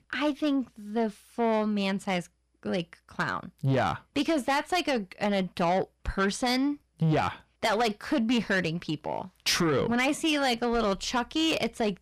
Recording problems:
distortion; slight; 10 dB below the speech

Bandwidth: 14.5 kHz